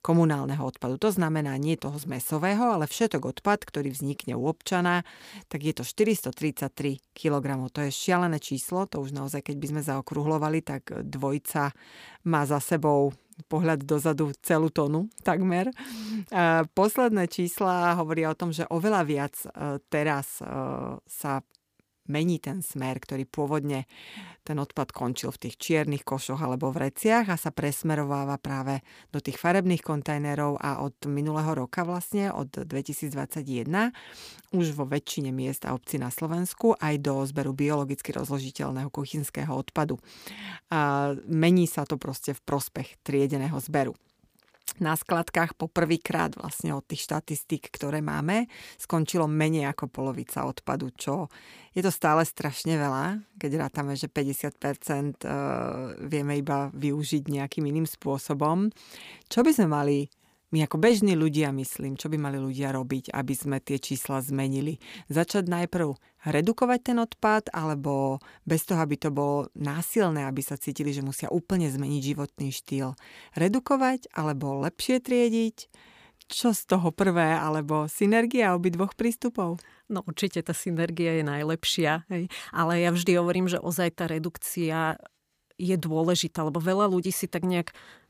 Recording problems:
none

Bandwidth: 15 kHz